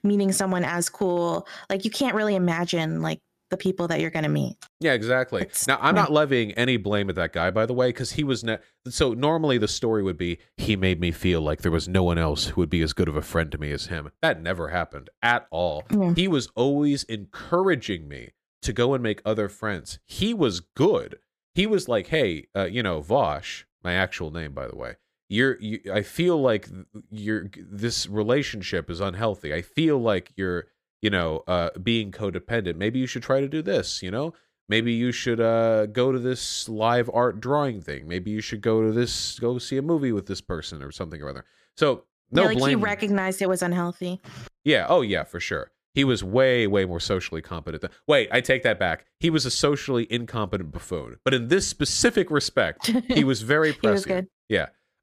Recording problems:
none

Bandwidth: 14.5 kHz